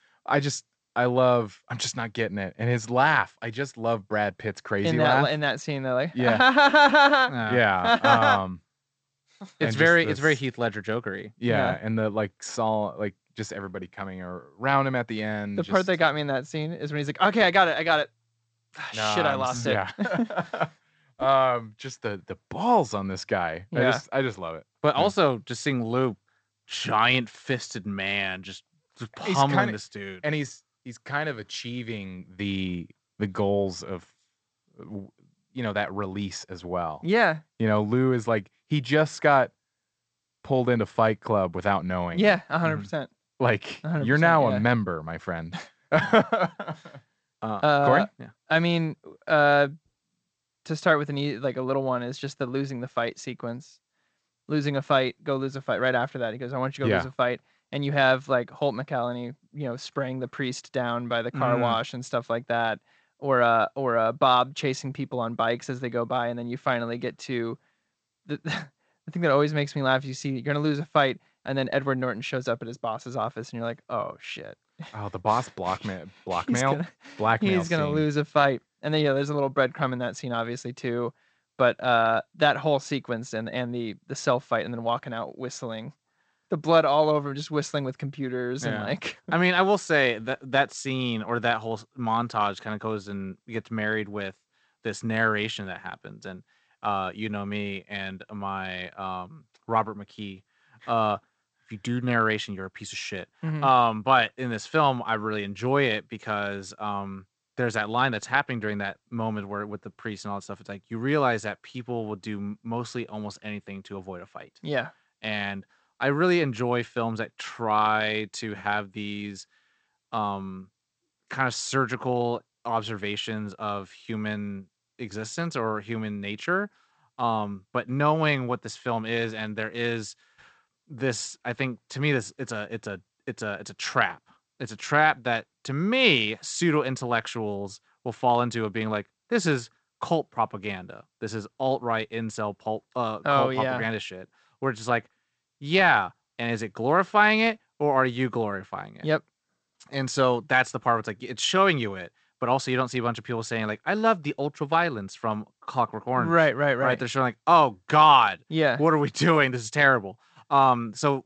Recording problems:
garbled, watery; slightly; nothing above 8 kHz

